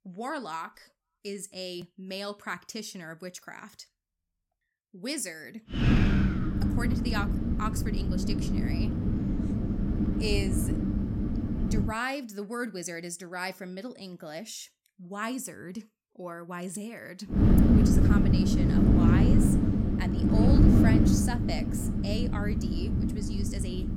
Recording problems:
wind noise on the microphone; heavy; from 6 to 12 s and from 17 s on; 4 dB above the speech

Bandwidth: 16.5 kHz